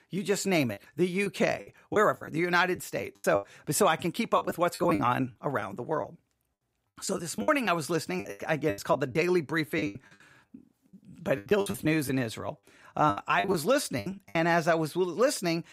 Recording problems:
choppy; very; 12% of the speech affected

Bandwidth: 15.5 kHz